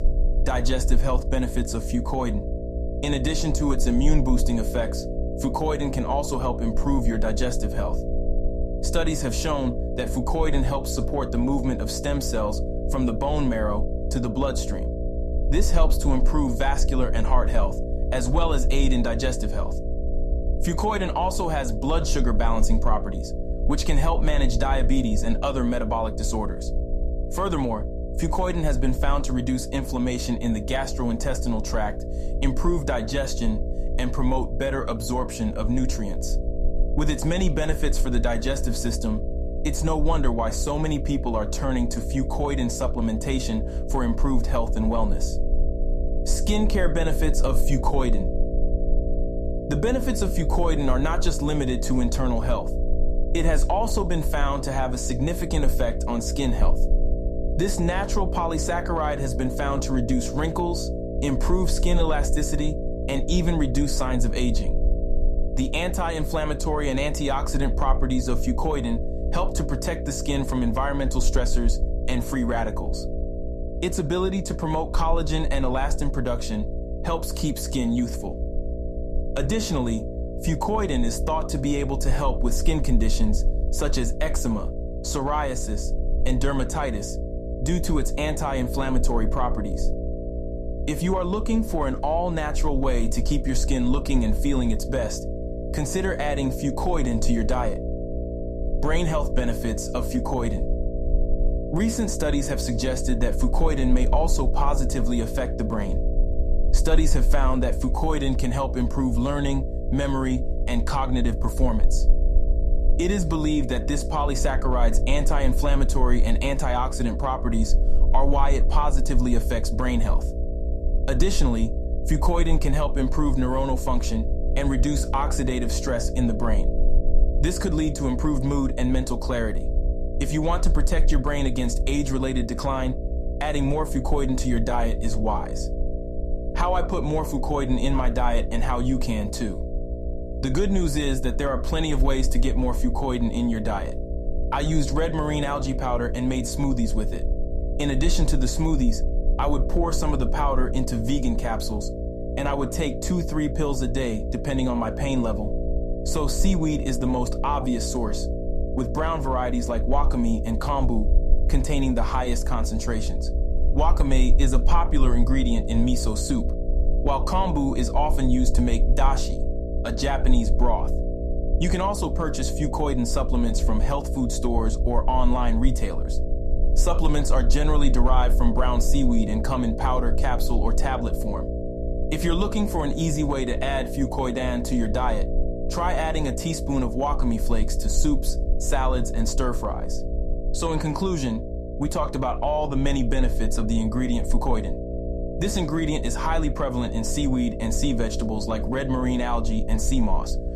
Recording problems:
electrical hum; loud; throughout; 60 Hz, 8 dB below the speech
low rumble; faint; throughout; 25 dB below the speech

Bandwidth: 14.5 kHz